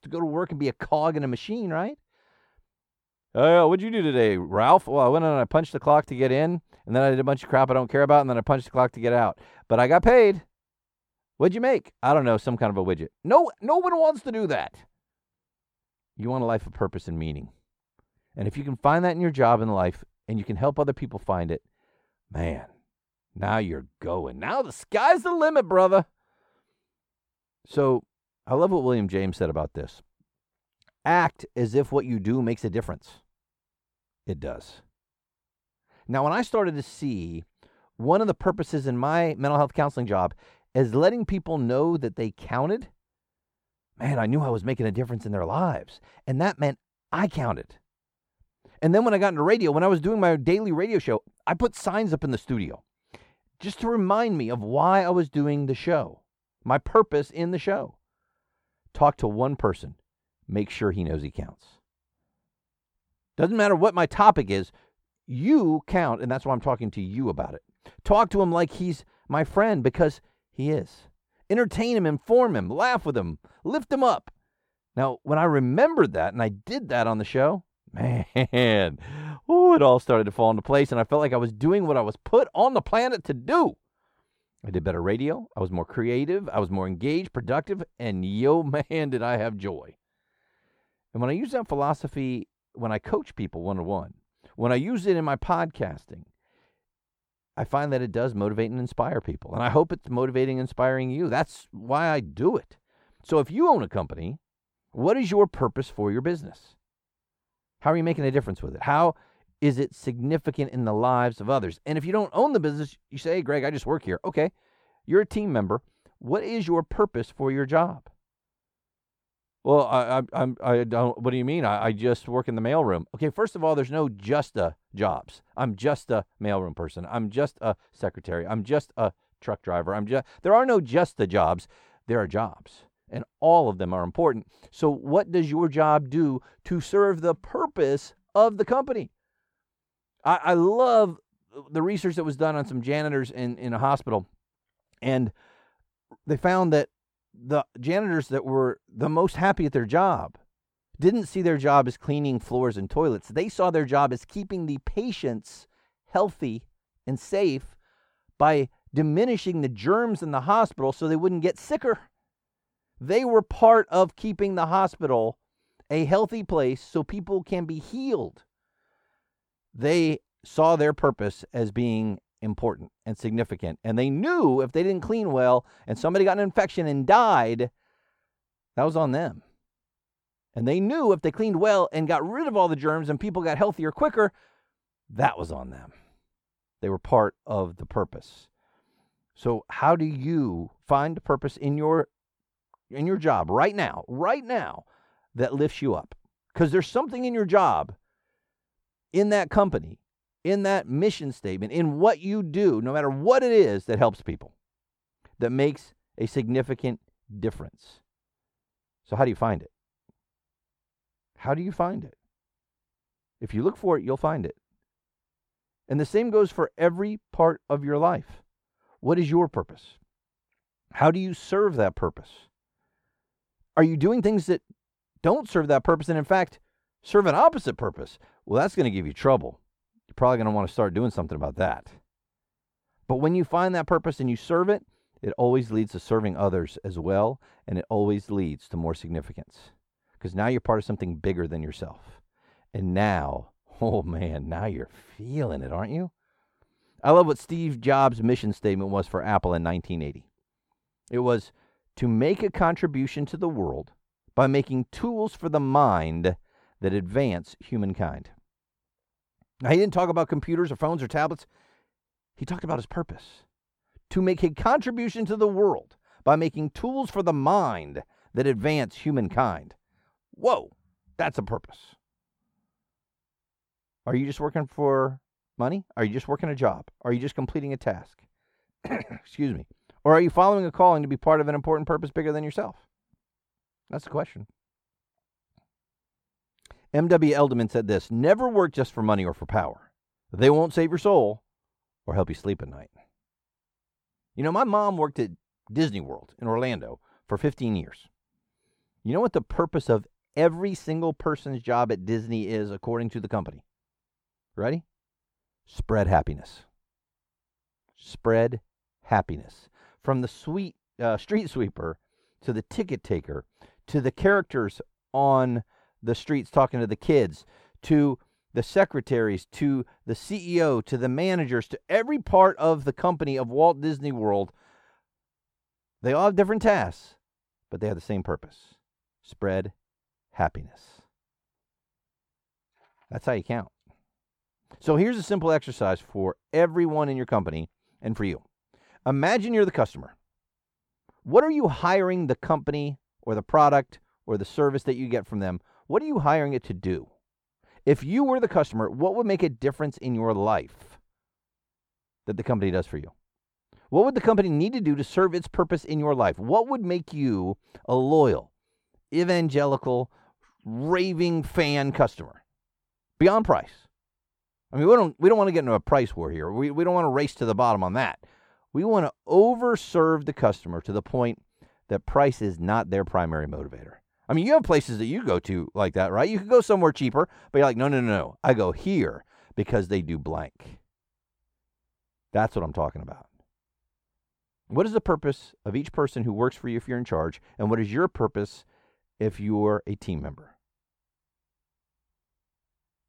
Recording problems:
muffled; slightly; fading above 2.5 kHz

